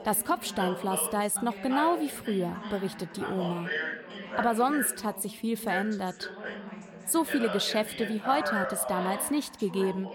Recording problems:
background chatter; loud; throughout; 3 voices, 6 dB below the speech

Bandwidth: 17.5 kHz